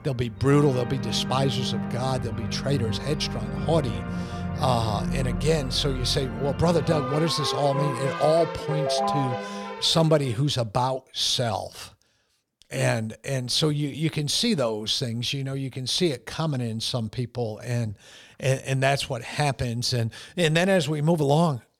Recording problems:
background music; loud; until 10 s; 6 dB below the speech

